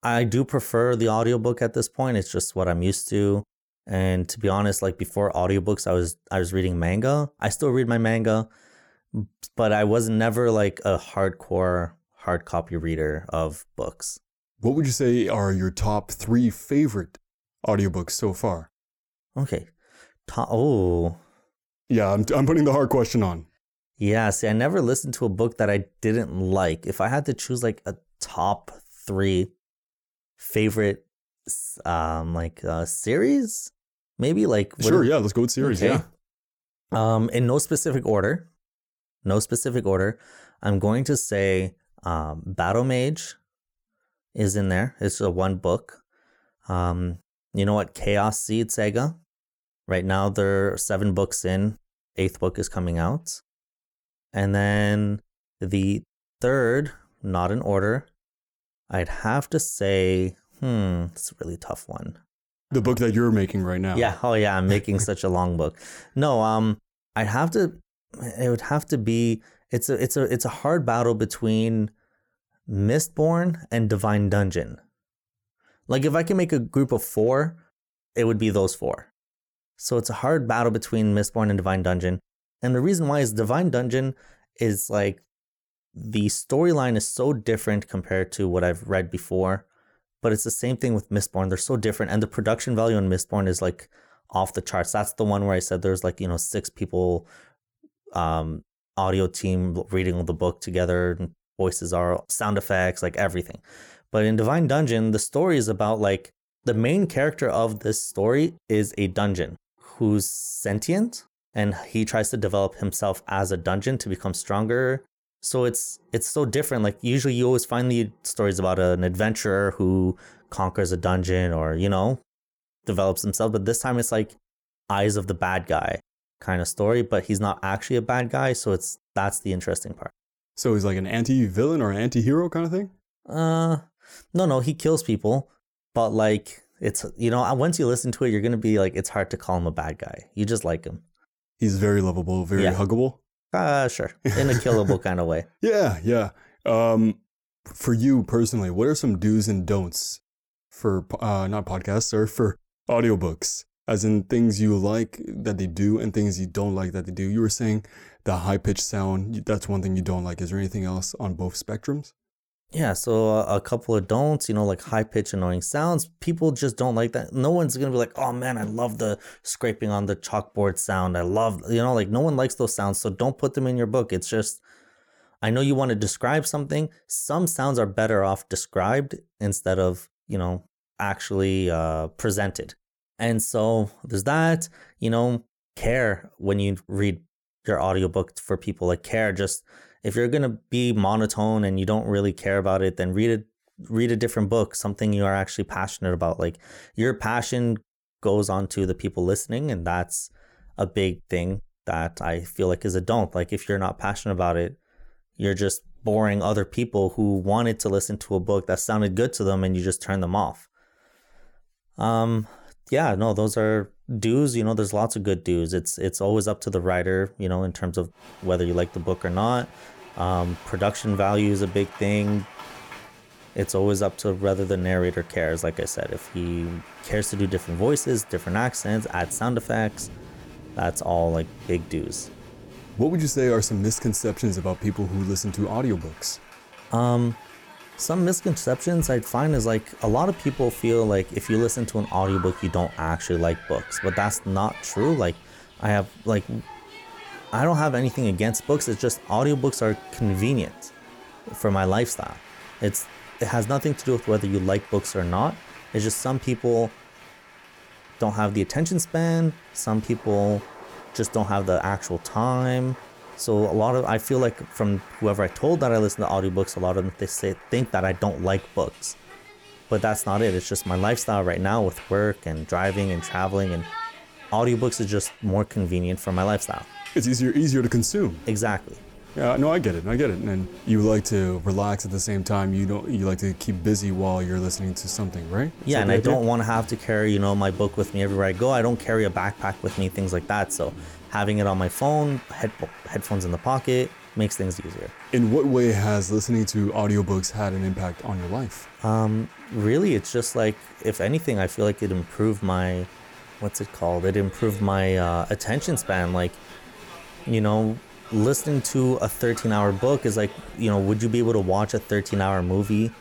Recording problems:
crowd noise; noticeable; from 3:38 on; 20 dB below the speech

